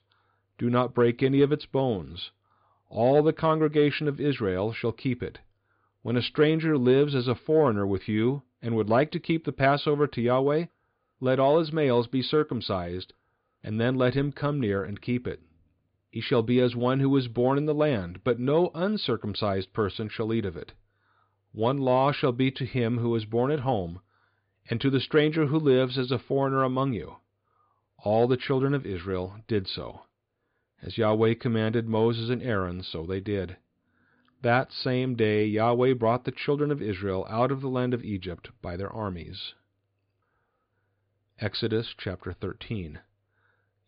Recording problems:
high frequencies cut off; severe; nothing above 5 kHz

